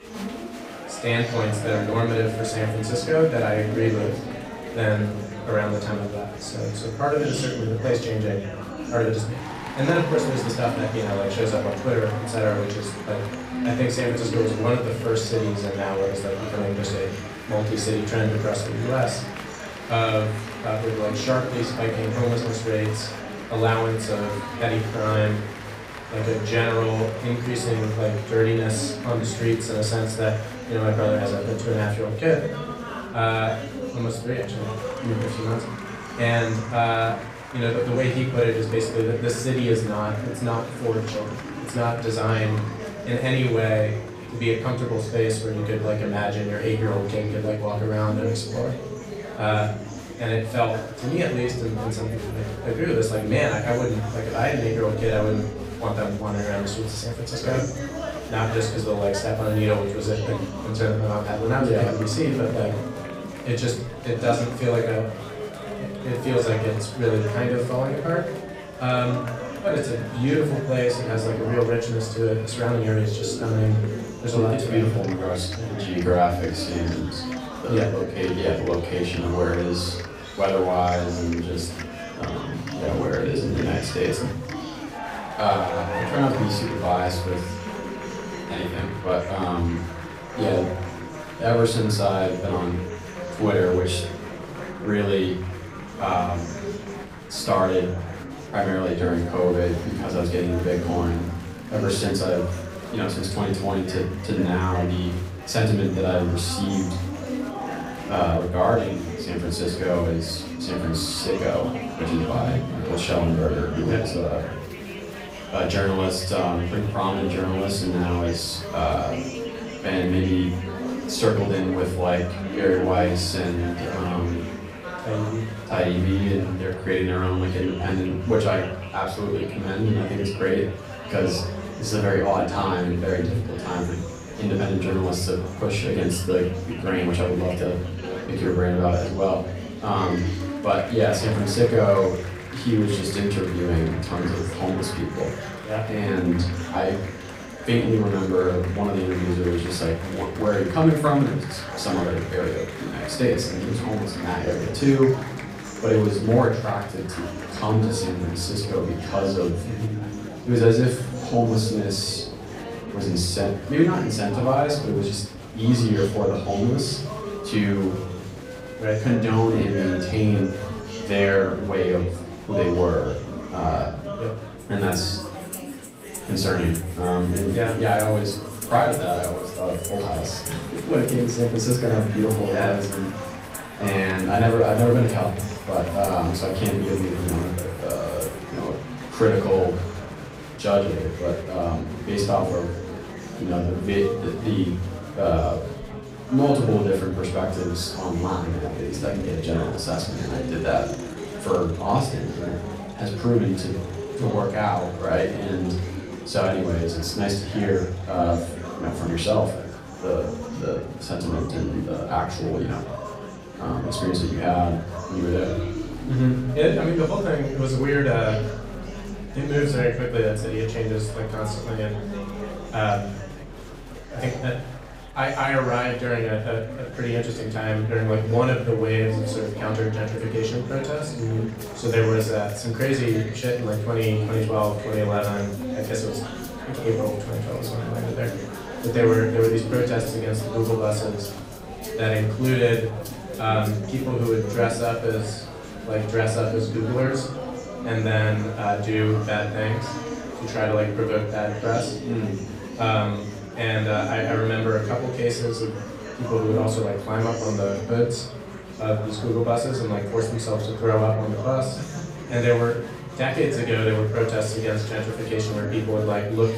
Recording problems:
off-mic speech; far
room echo; slight; dies away in 0.5 s
background music; noticeable; throughout; 20 dB below the speech
murmuring crowd; noticeable; throughout; 10 dB below the speech

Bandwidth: 15.5 kHz